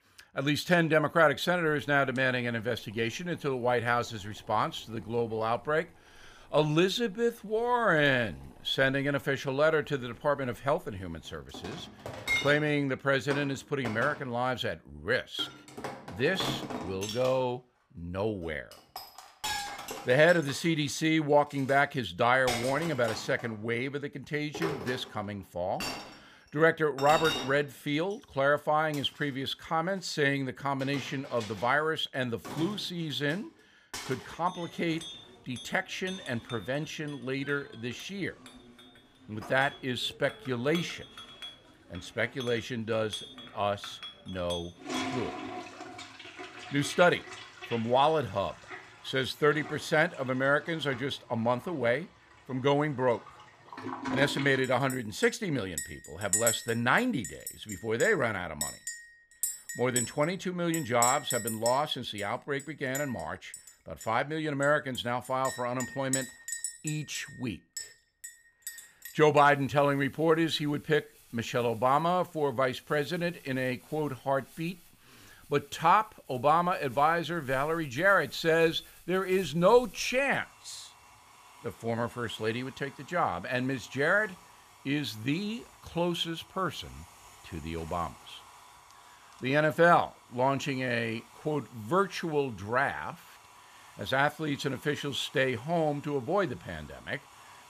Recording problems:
household noises; loud; throughout; 10 dB below the speech

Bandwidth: 15 kHz